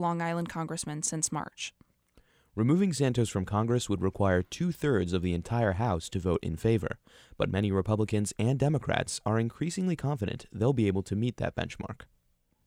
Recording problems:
abrupt cut into speech; at the start

